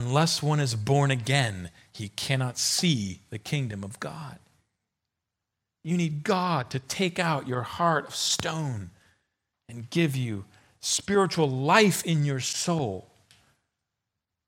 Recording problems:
abrupt cut into speech; at the start

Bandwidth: 16 kHz